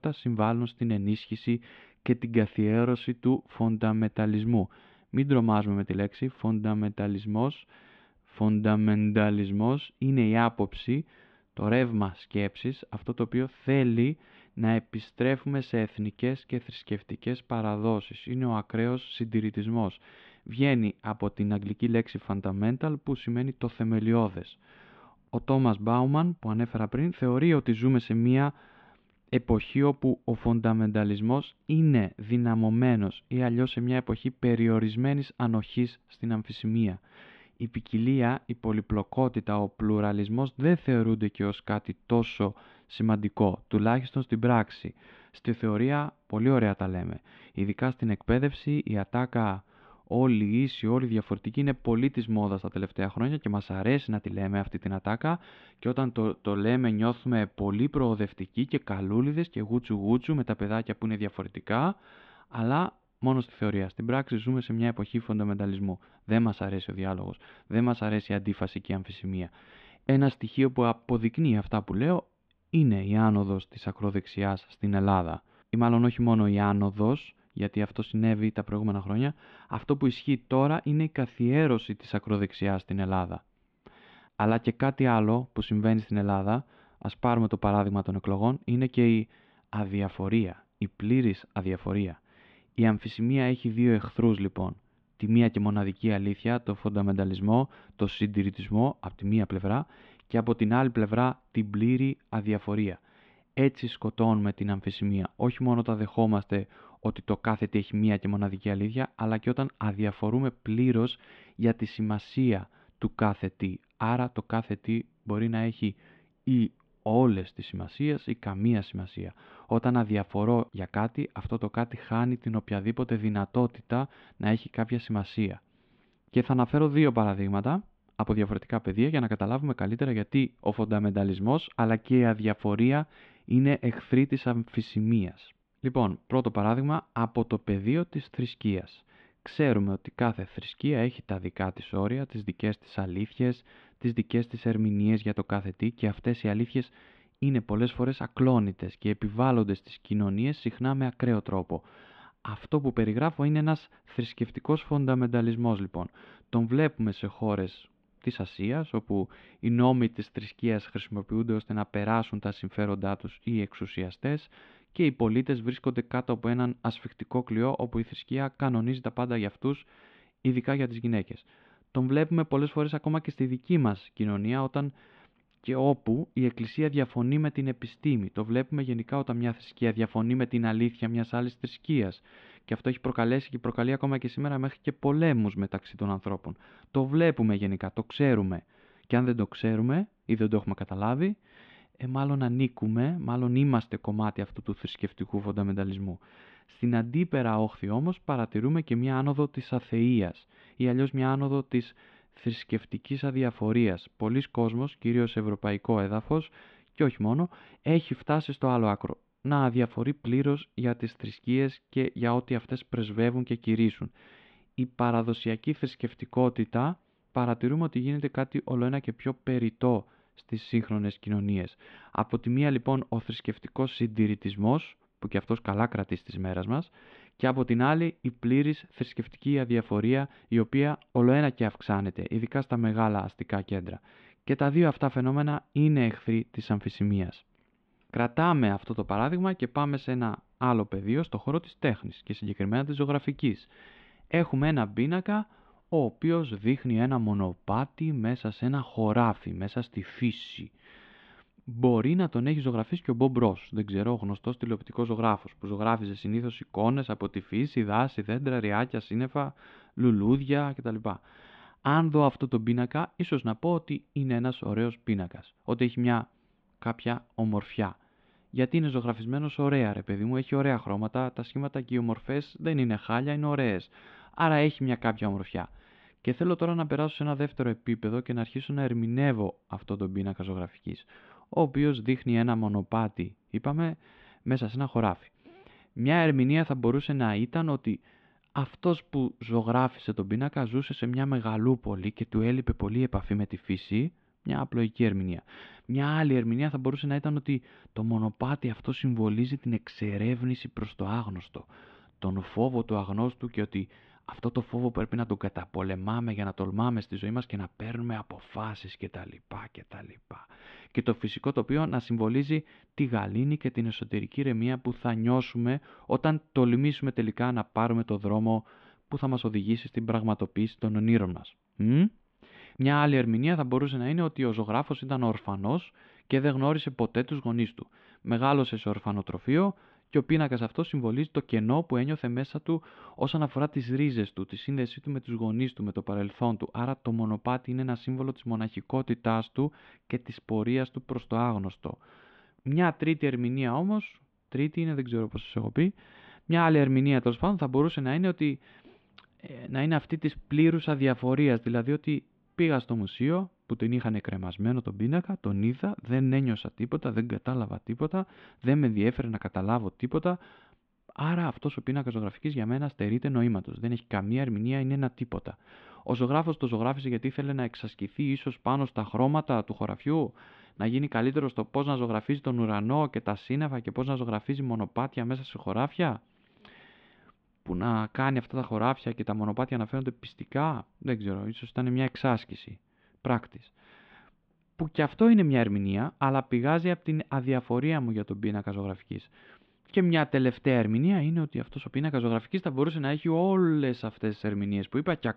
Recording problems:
muffled; very; fading above 3.5 kHz

